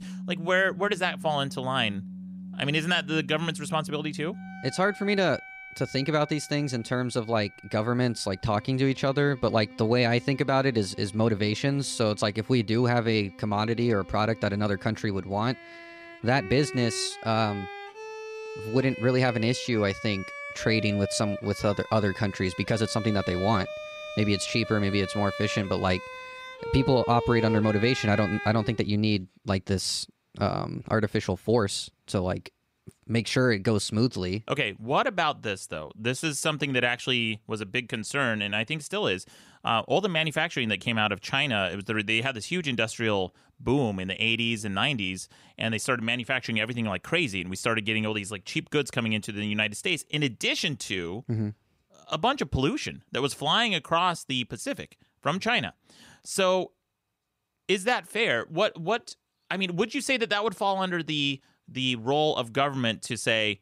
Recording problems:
background music; noticeable; until 29 s; 10 dB below the speech

